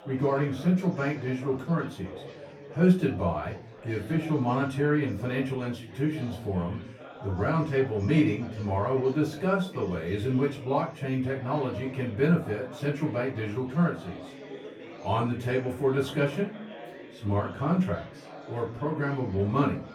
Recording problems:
off-mic speech; far
room echo; slight; dies away in 0.3 s
chatter from many people; noticeable; throughout; 15 dB below the speech

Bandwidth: 18 kHz